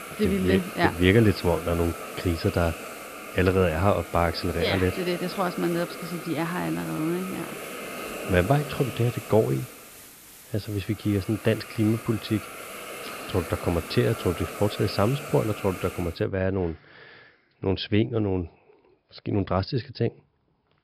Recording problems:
high frequencies cut off; noticeable; nothing above 5 kHz
hiss; noticeable; until 16 s; 10 dB below the speech

